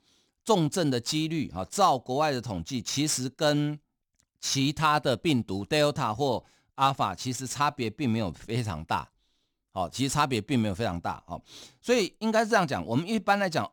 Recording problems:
none

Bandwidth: 18.5 kHz